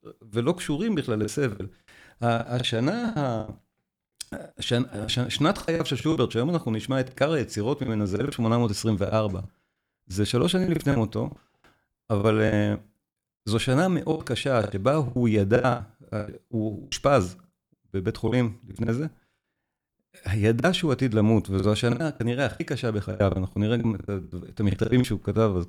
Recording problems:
choppy; very; 13% of the speech affected

